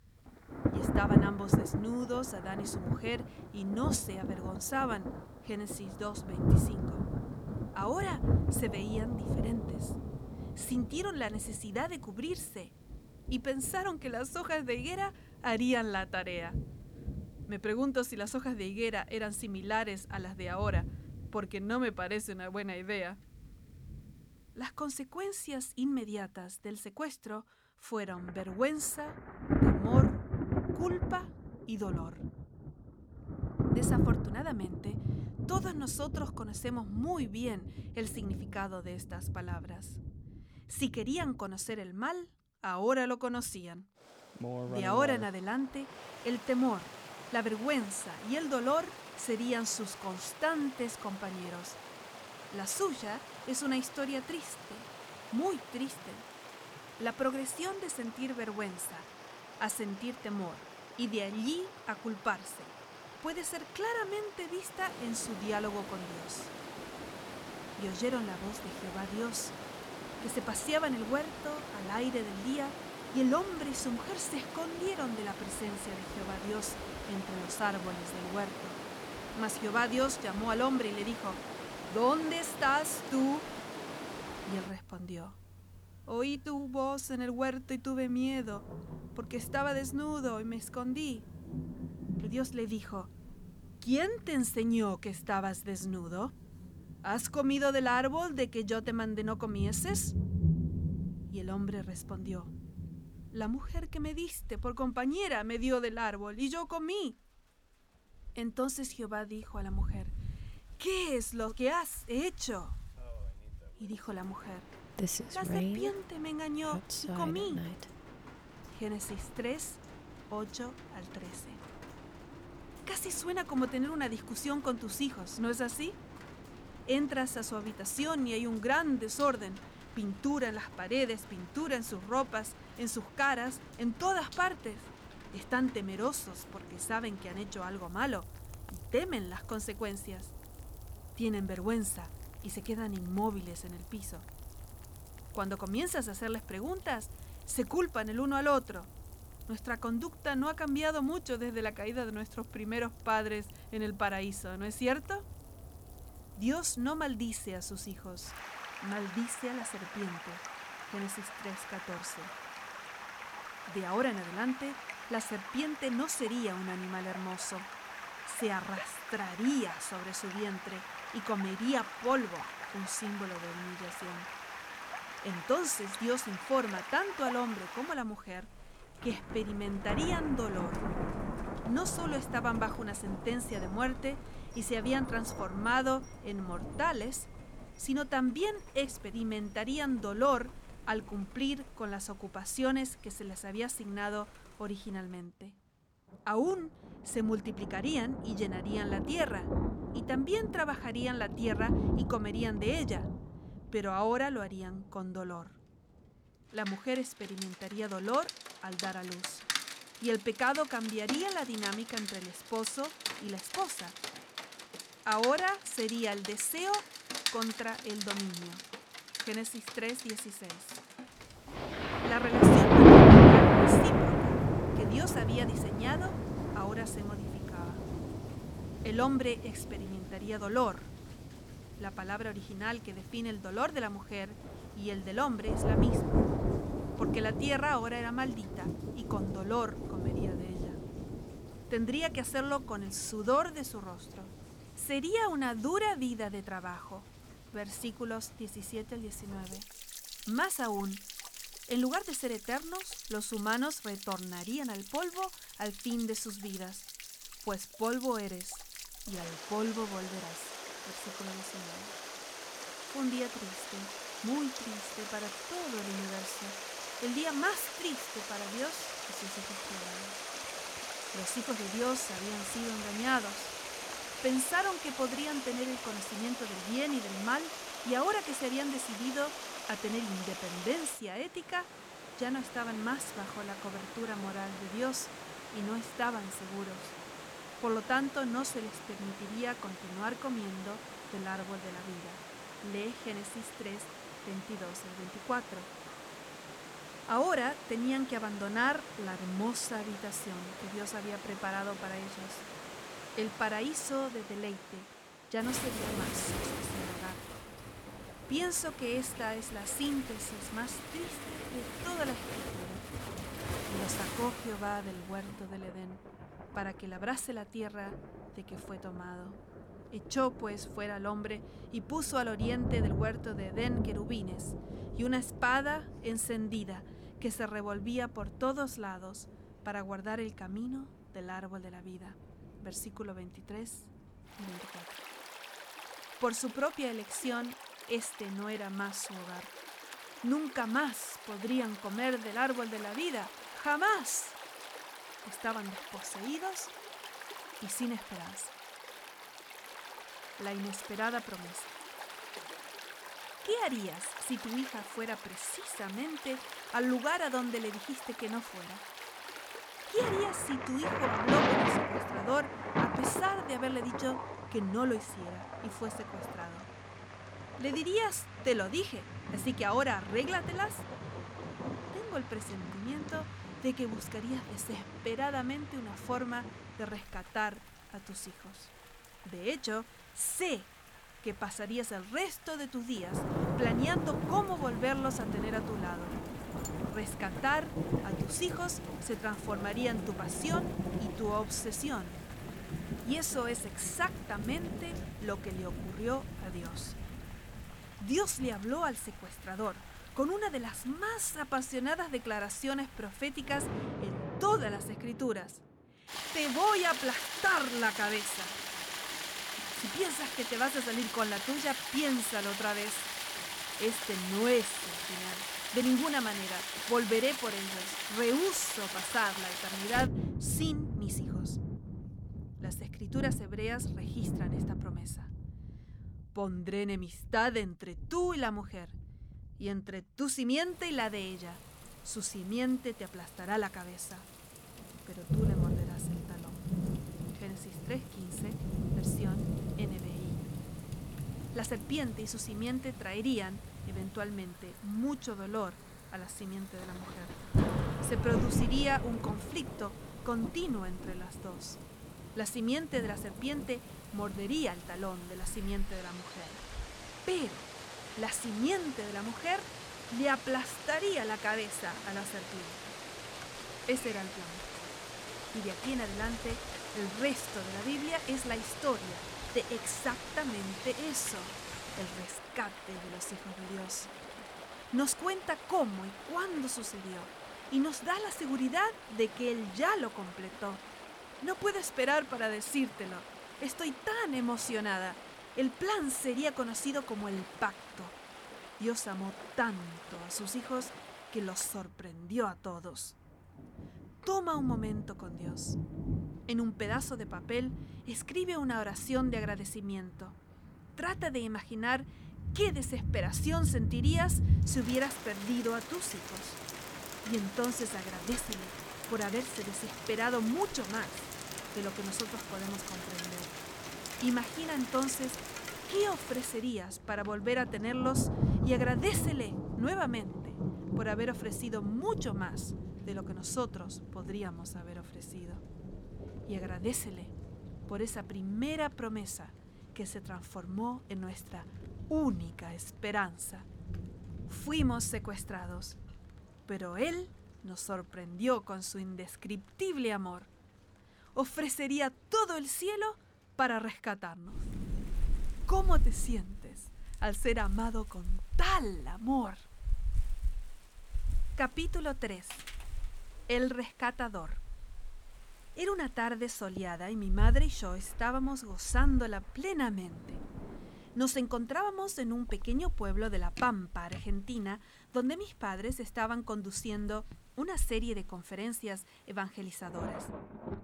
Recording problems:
rain or running water; loud; throughout; as loud as the speech

